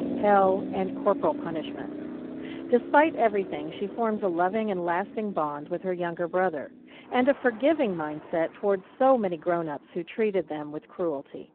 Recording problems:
phone-call audio; poor line
traffic noise; noticeable; throughout; 10 dB below the speech

